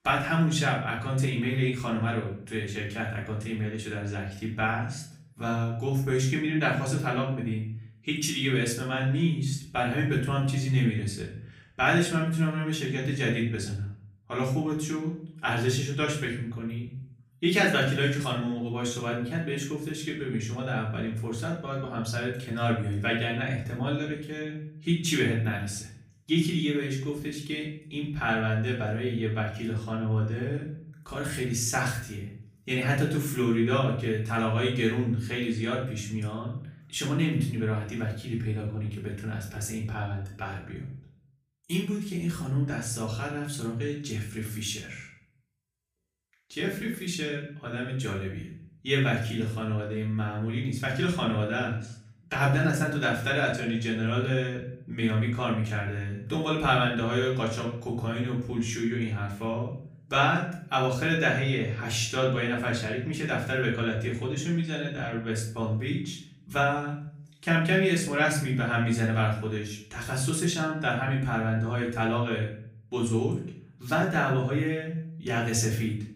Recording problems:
off-mic speech; far
room echo; slight; dies away in 0.5 s

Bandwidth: 15 kHz